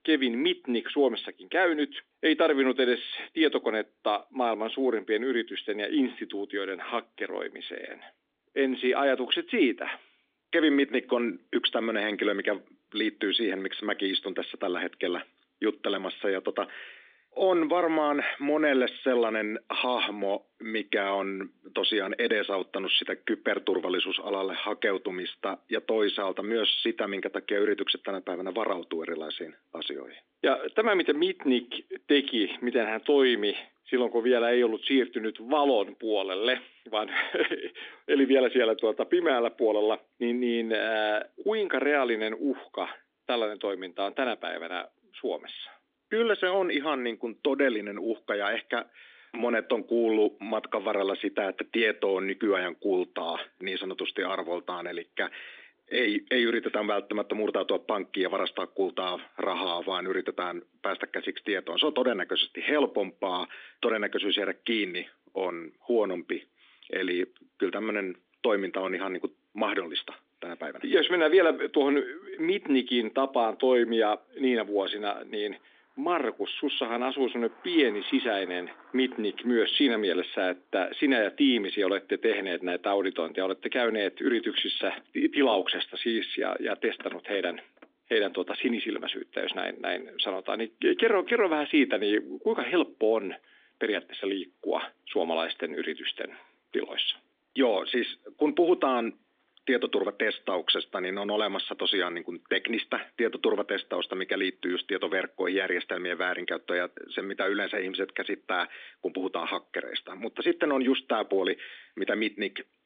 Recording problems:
phone-call audio
traffic noise; faint; from 54 s on; 25 dB below the speech

